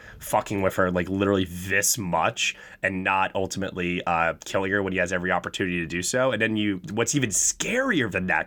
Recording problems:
none

